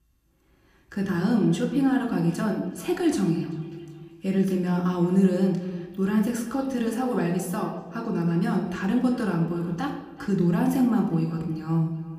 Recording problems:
echo of what is said; faint; throughout; 380 ms later, 20 dB below the speech
room echo; slight; dies away in 0.9 s
off-mic speech; somewhat distant

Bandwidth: 15 kHz